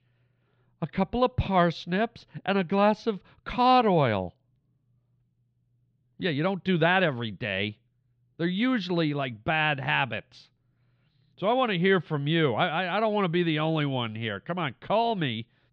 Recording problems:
muffled; very slightly; fading above 3.5 kHz

